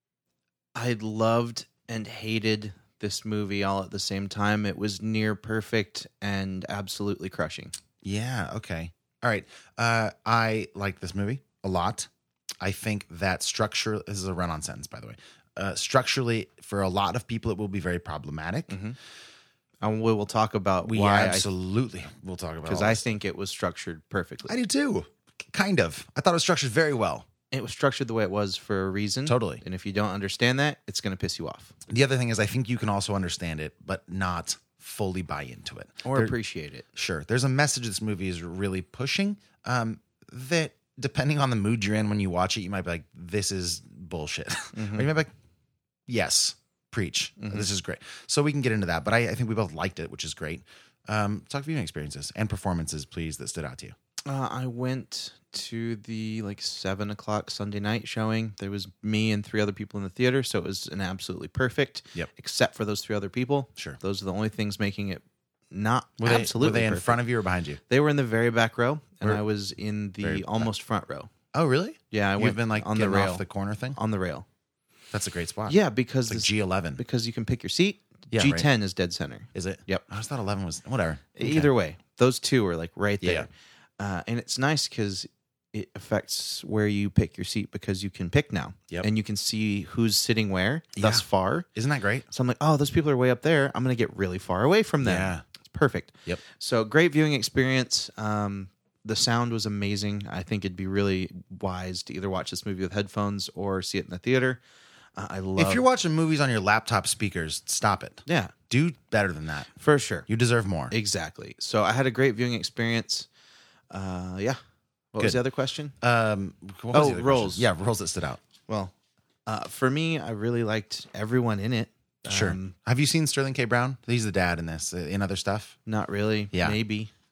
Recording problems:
none

